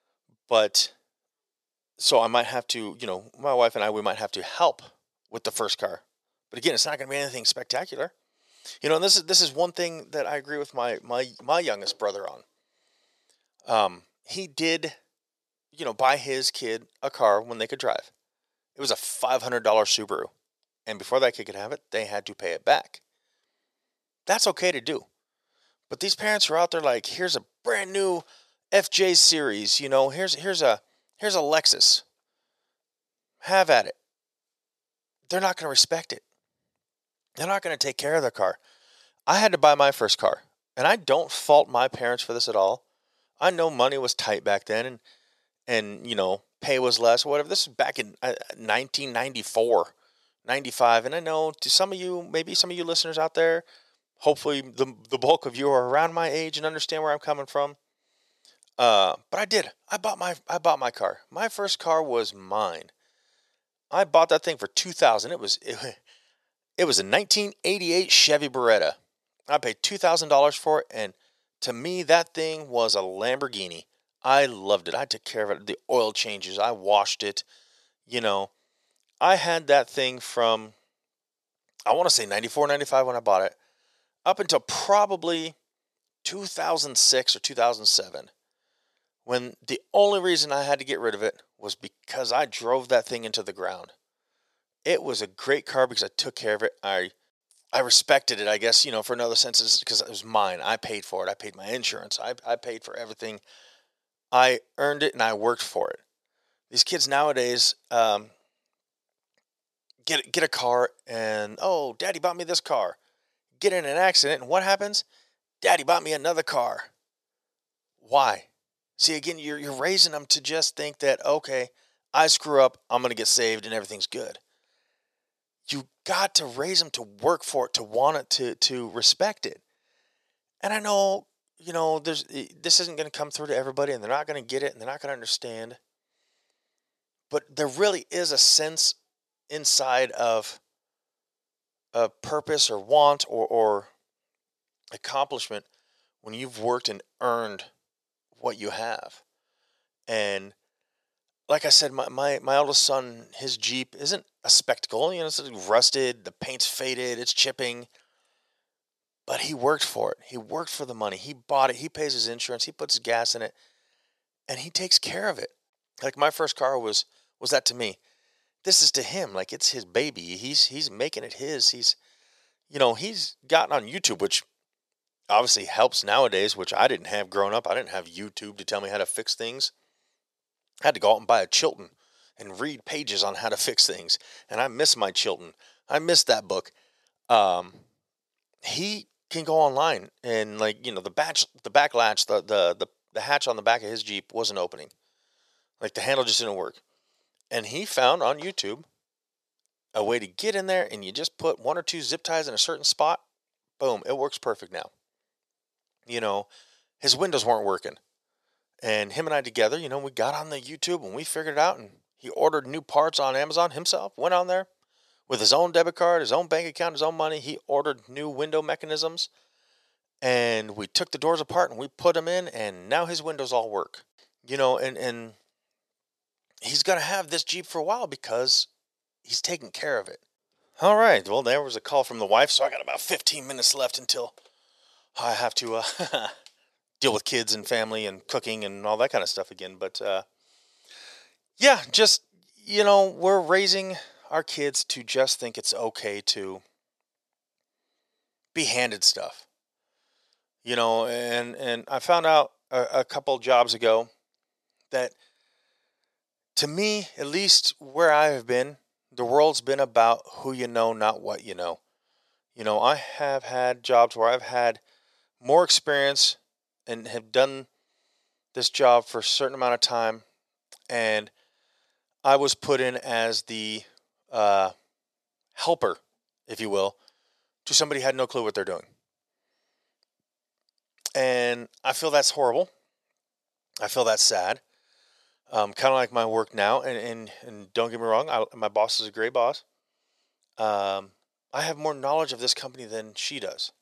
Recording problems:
thin; very; fading below 450 Hz

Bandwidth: 13.5 kHz